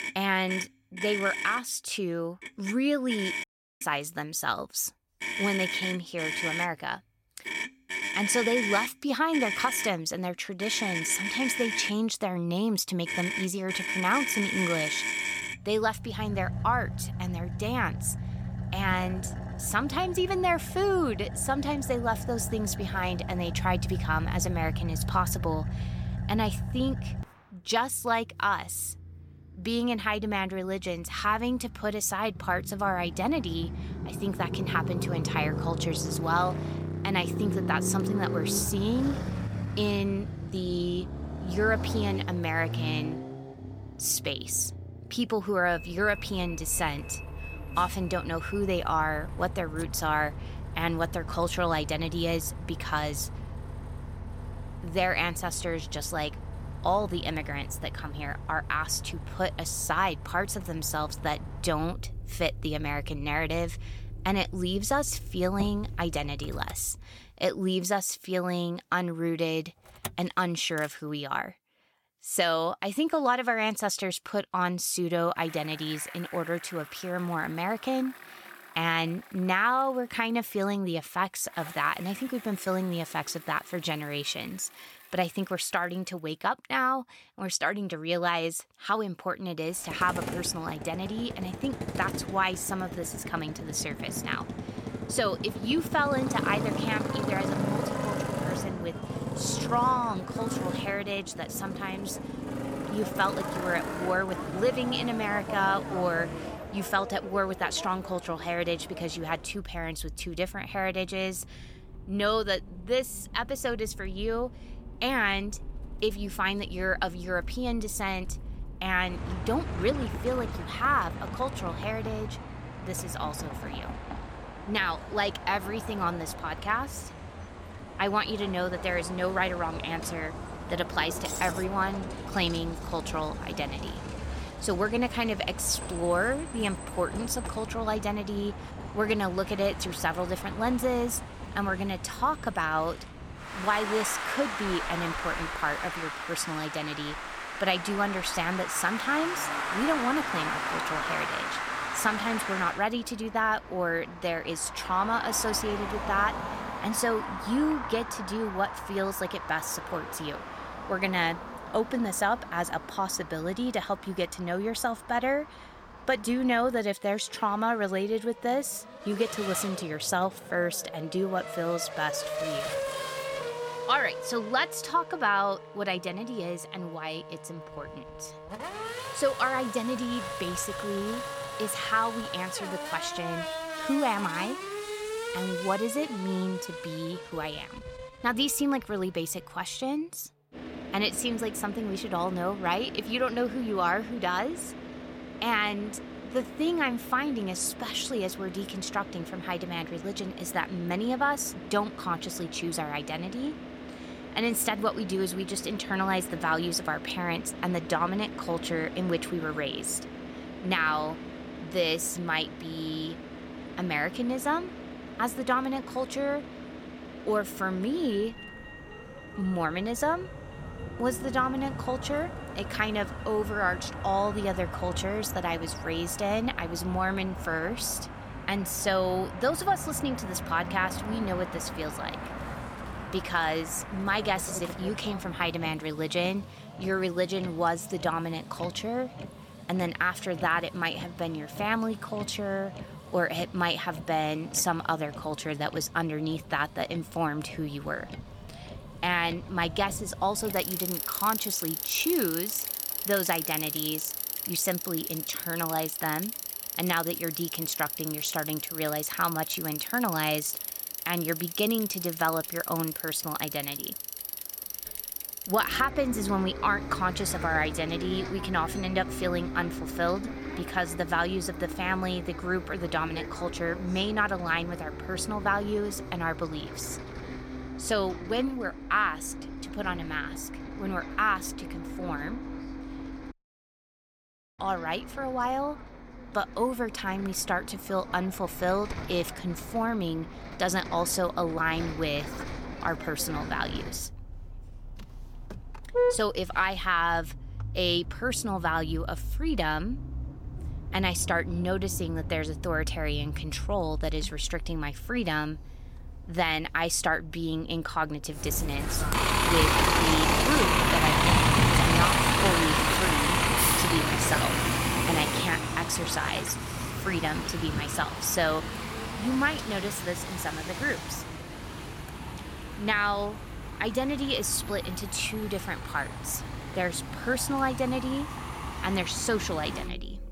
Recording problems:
traffic noise; loud; throughout; 4 dB below the speech
audio cutting out; at 3.5 s and at 4:43 for 1.5 s

